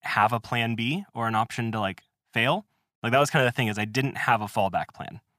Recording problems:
none

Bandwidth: 15 kHz